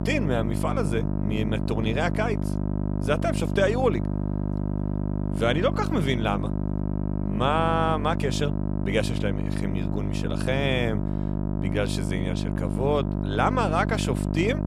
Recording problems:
electrical hum; loud; throughout; 50 Hz, 8 dB below the speech

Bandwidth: 15 kHz